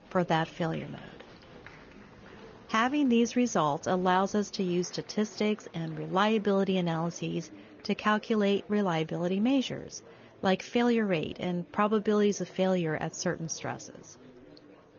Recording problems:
garbled, watery; slightly; nothing above 6.5 kHz
murmuring crowd; faint; throughout; 25 dB below the speech

